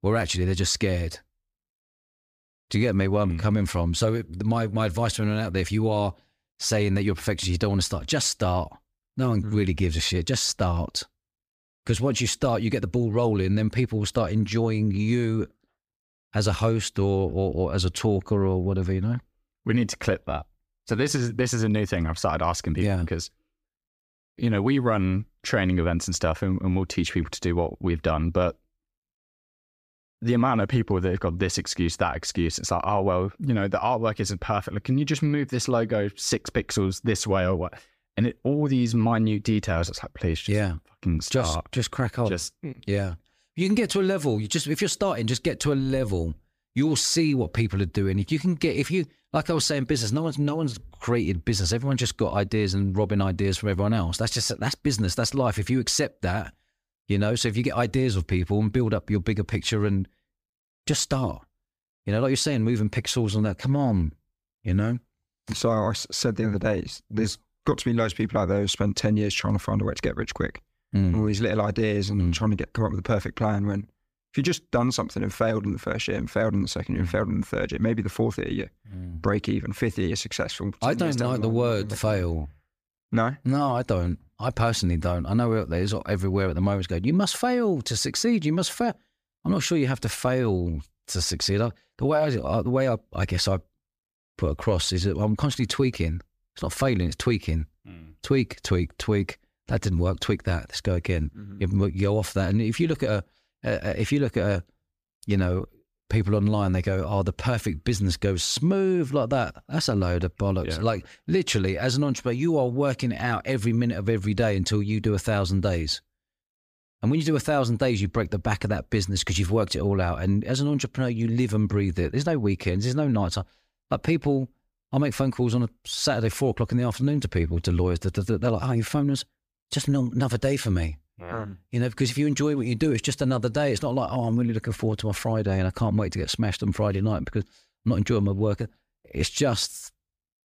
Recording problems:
none

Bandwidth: 15 kHz